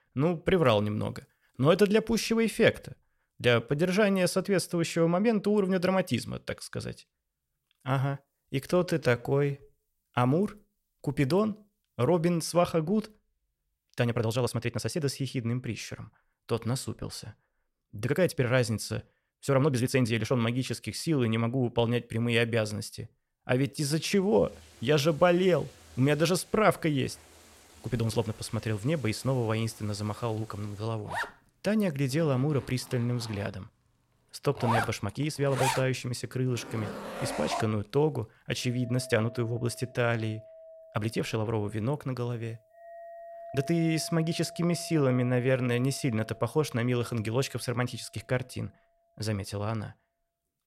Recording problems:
household noises; noticeable; from 24 s on; 10 dB below the speech
uneven, jittery; strongly; from 8 to 46 s

